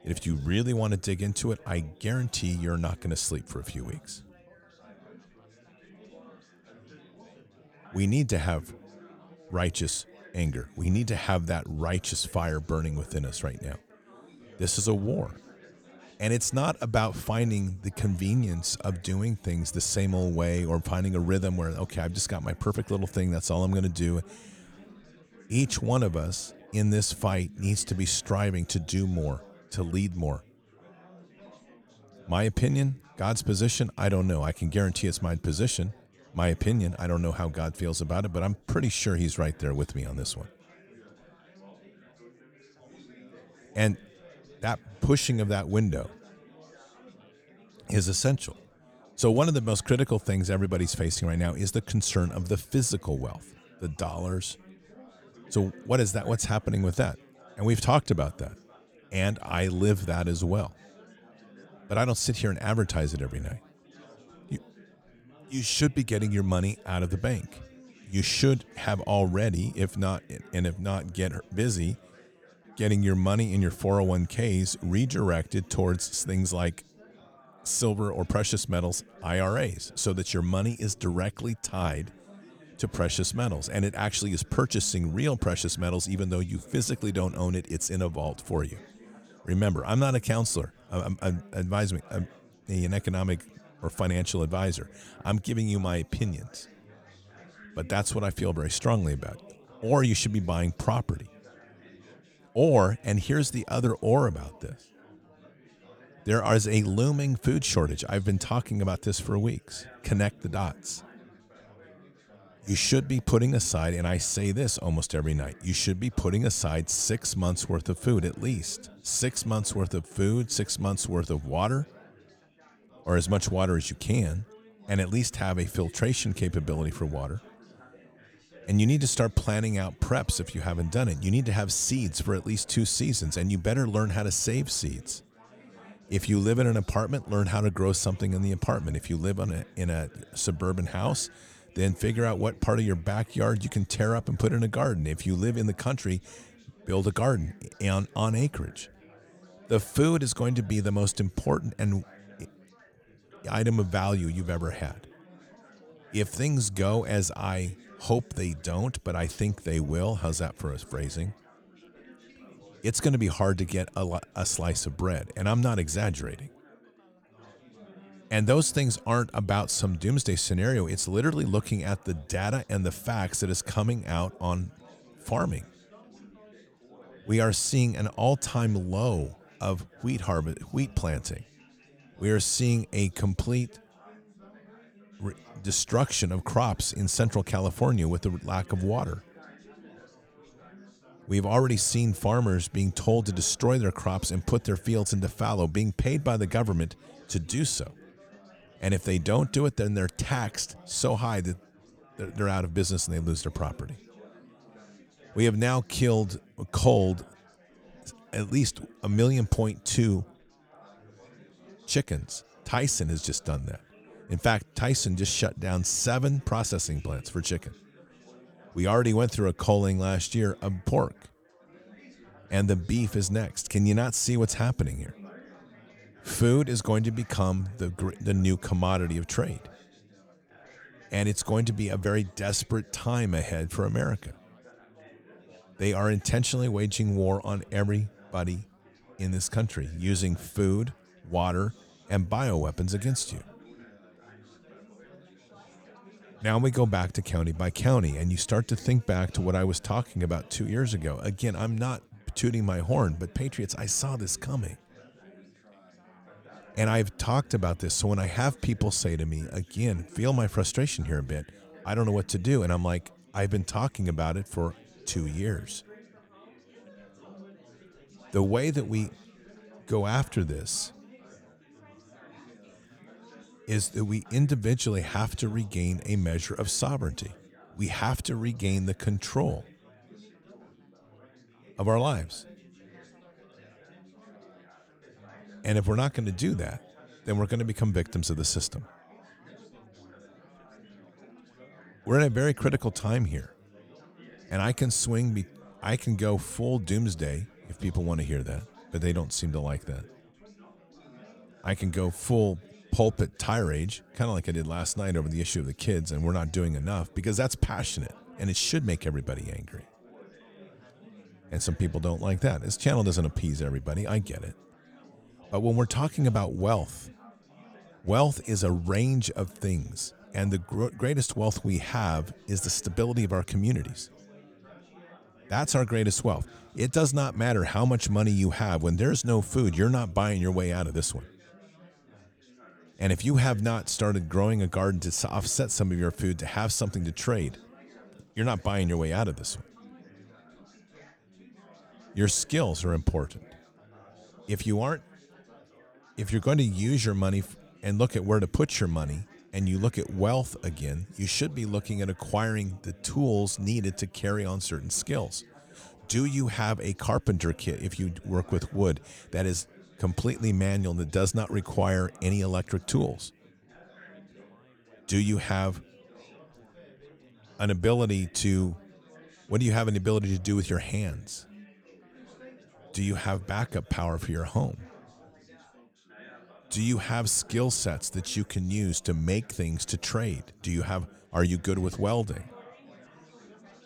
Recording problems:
chatter from many people; faint; throughout; 25 dB below the speech

